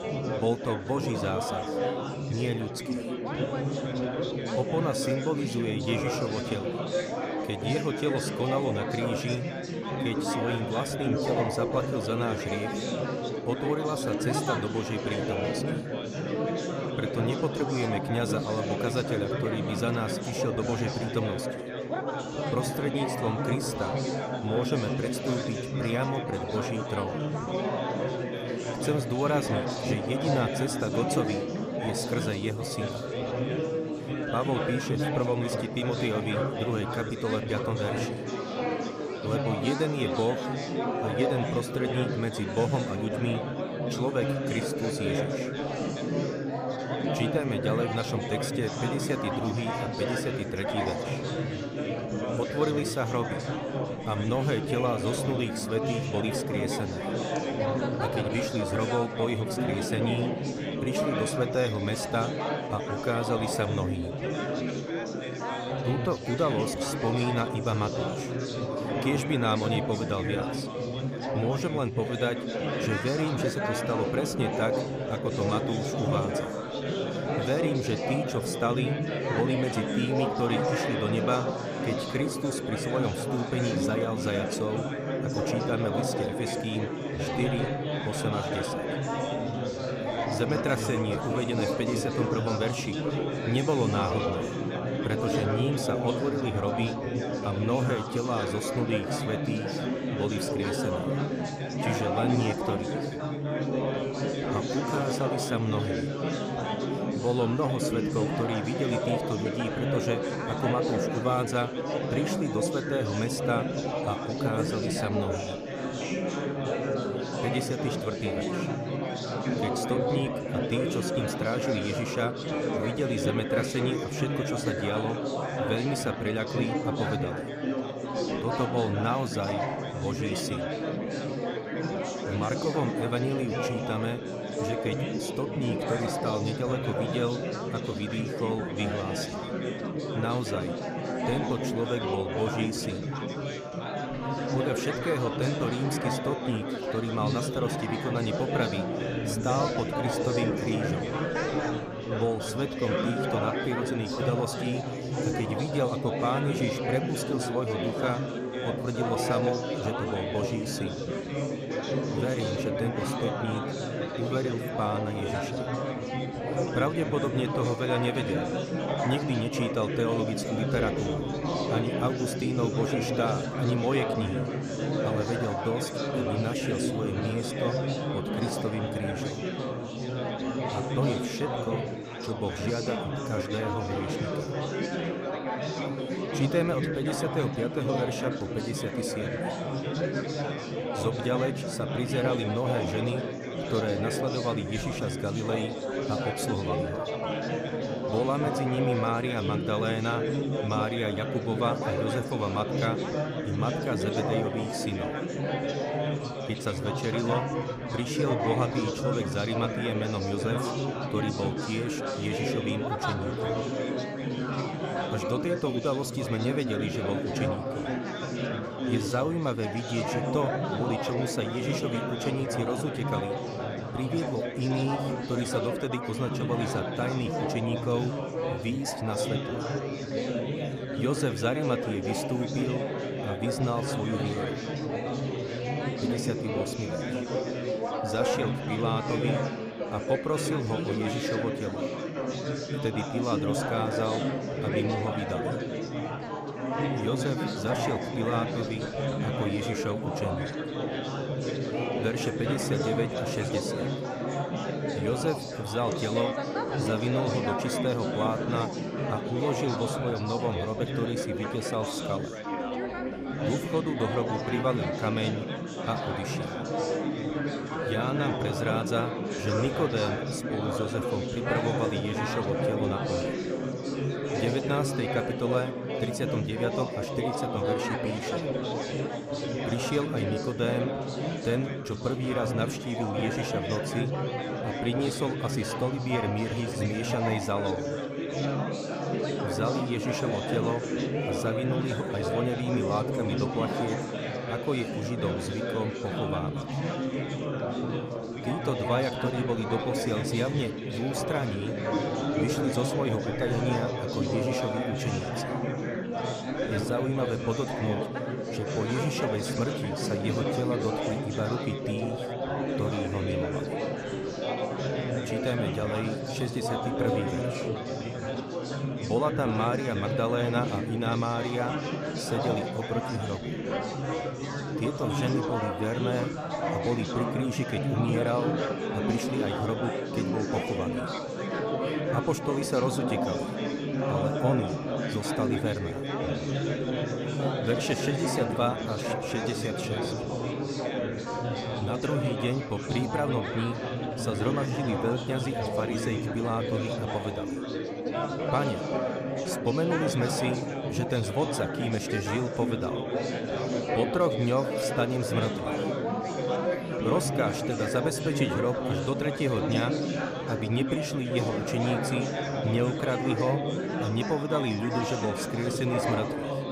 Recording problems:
chatter from many people; very loud; throughout; 1 dB above the speech

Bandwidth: 15 kHz